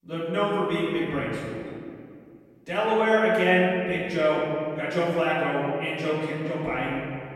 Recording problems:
room echo; strong; dies away in 2.2 s
off-mic speech; far

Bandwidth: 16 kHz